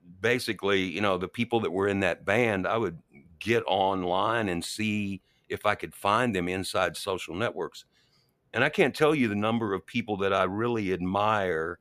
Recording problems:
none

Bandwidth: 15 kHz